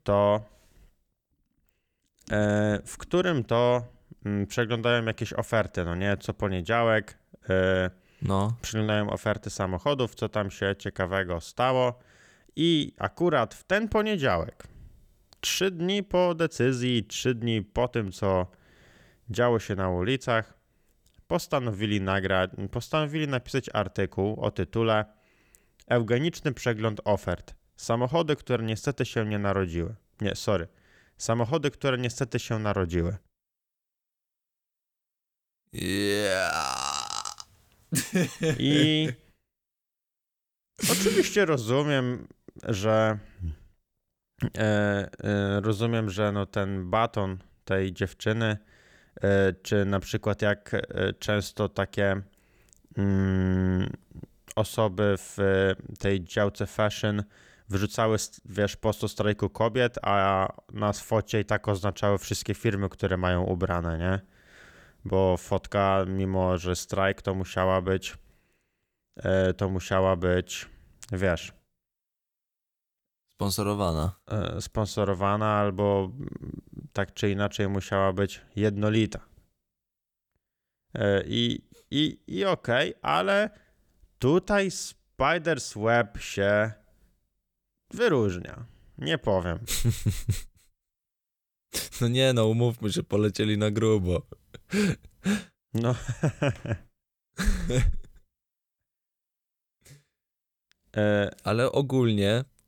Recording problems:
none

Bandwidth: 19 kHz